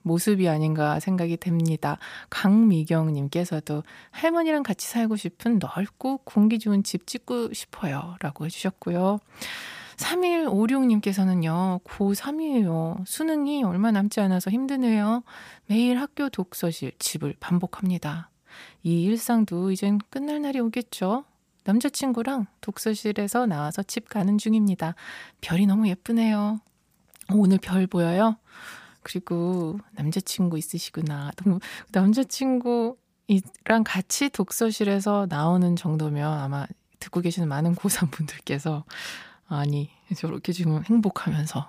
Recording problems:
none

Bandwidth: 15 kHz